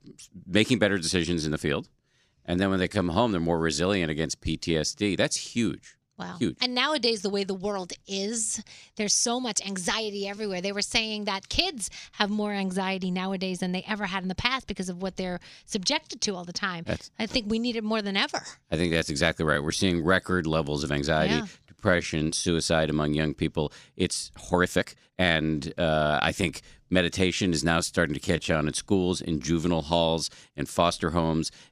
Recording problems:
uneven, jittery; strongly; from 2 to 29 s

